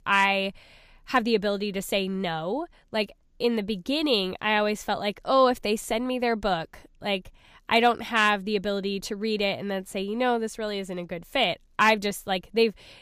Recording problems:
none

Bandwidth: 15 kHz